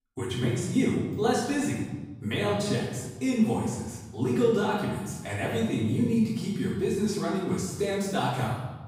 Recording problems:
off-mic speech; far
room echo; noticeable; dies away in 1.1 s

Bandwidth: 15.5 kHz